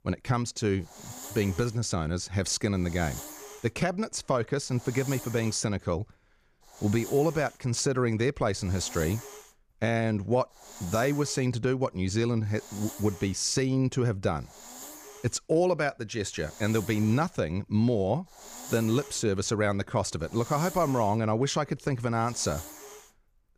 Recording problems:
hiss; noticeable; throughout; 15 dB below the speech

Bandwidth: 15 kHz